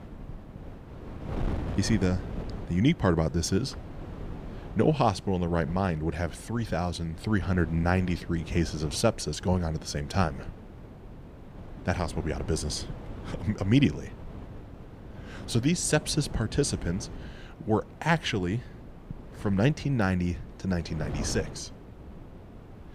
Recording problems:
wind noise on the microphone; occasional gusts; 15 dB below the speech

